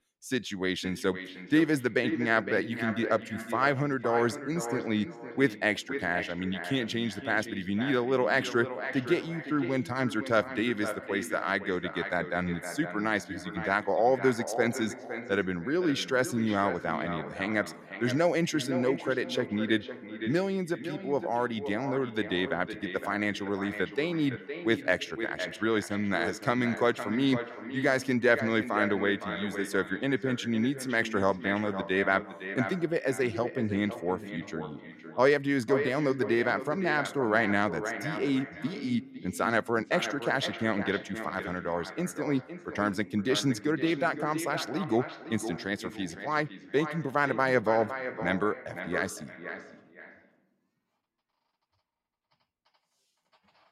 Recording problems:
echo of what is said; strong; throughout; 510 ms later, 9 dB below the speech

